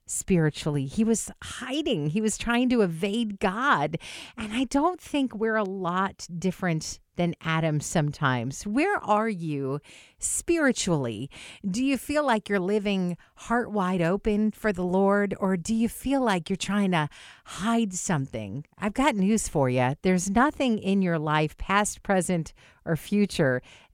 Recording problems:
none

